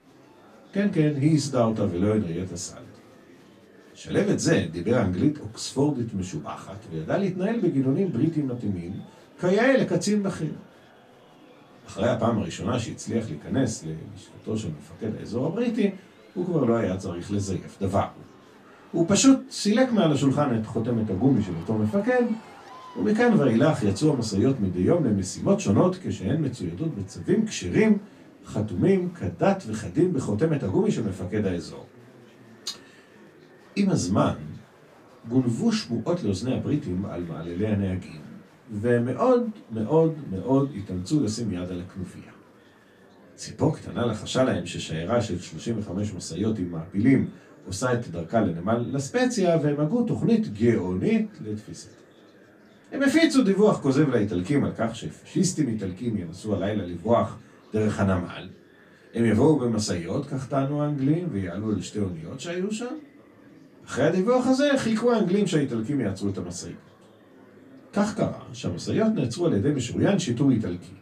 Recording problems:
off-mic speech; far
room echo; very slight; dies away in 0.2 s
murmuring crowd; faint; throughout; 25 dB below the speech

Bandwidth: 14.5 kHz